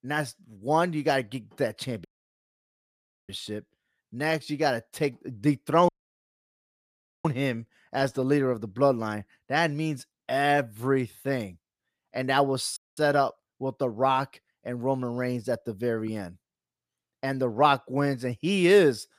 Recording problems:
audio cutting out; at 2 s for 1 s, at 6 s for 1.5 s and at 13 s

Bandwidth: 15 kHz